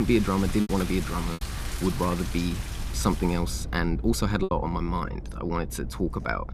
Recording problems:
rain or running water; noticeable; throughout; 10 dB below the speech
low rumble; faint; throughout; 20 dB below the speech
abrupt cut into speech; at the start
choppy; very; at 0.5 s and at 4.5 s; 8% of the speech affected

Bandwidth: 14.5 kHz